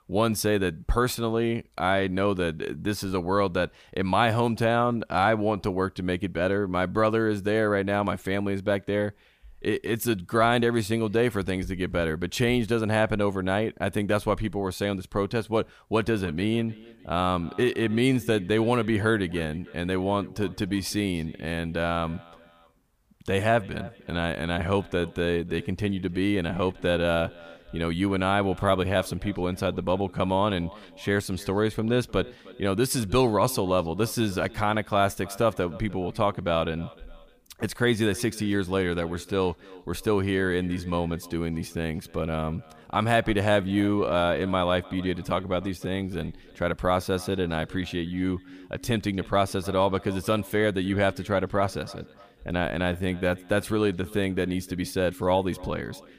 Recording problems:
echo of what is said; faint; from 16 s on; 300 ms later, 20 dB below the speech

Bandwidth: 15 kHz